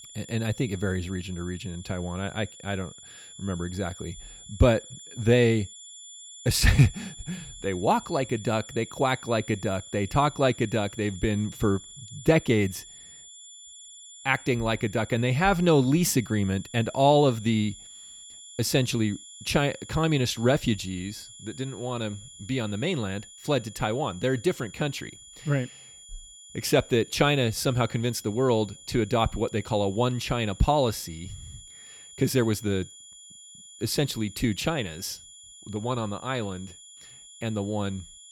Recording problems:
high-pitched whine; noticeable; throughout; 3.5 kHz, 15 dB below the speech

